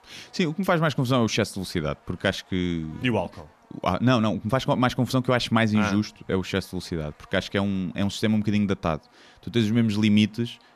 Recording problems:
electrical hum; faint; throughout; 50 Hz, 30 dB below the speech

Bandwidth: 14.5 kHz